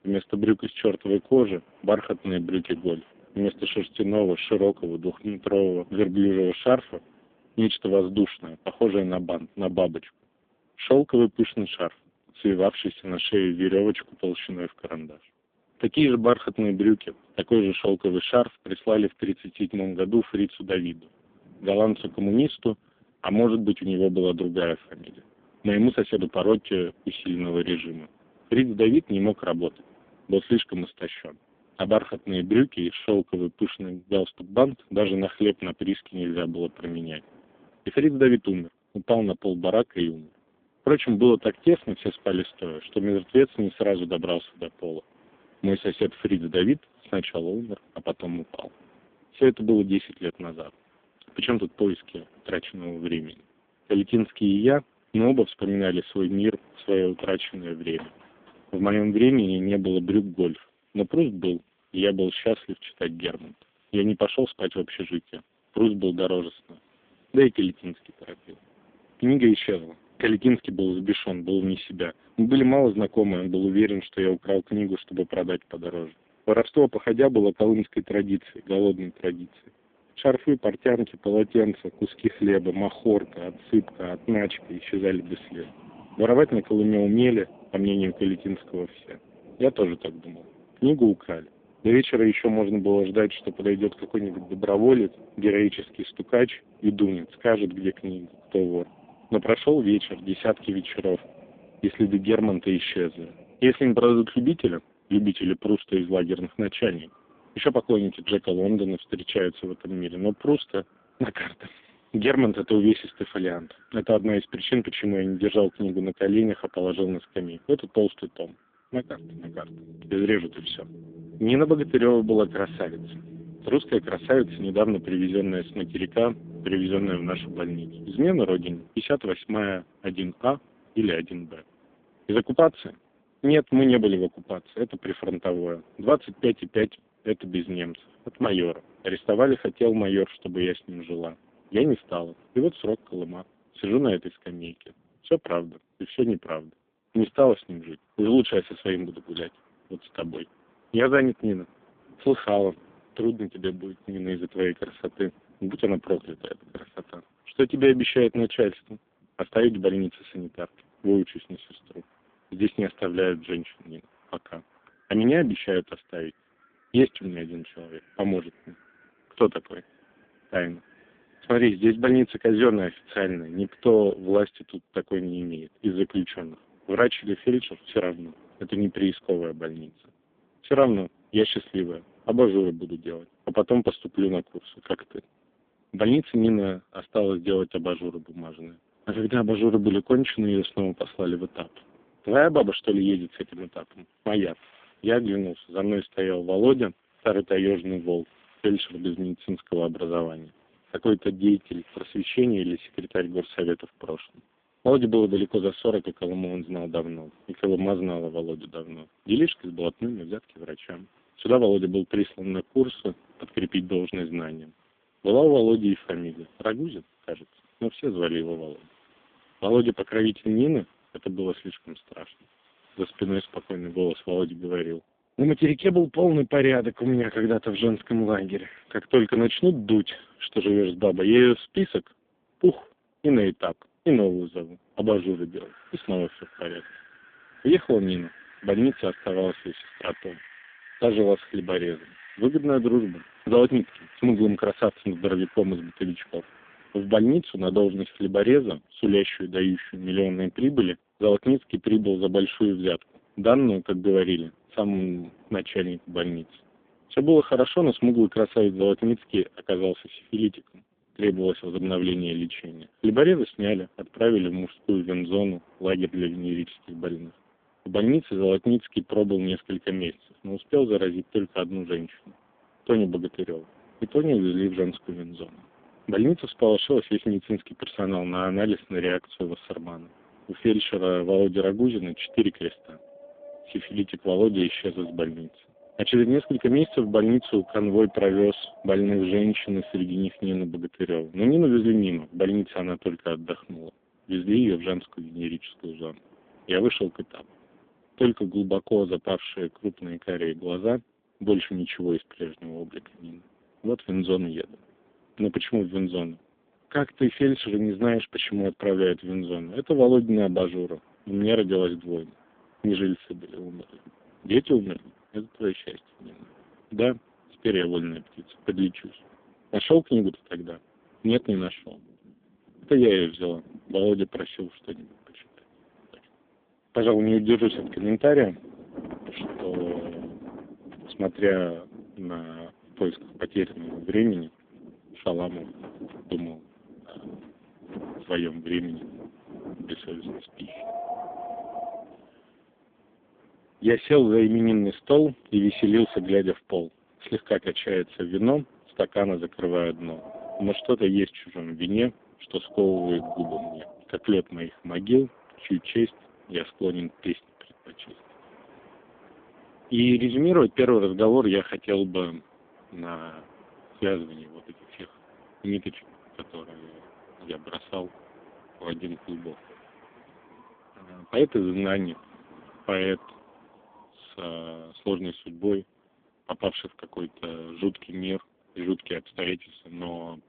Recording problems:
phone-call audio; poor line; nothing above 3.5 kHz
wind in the background; faint; throughout; 25 dB below the speech

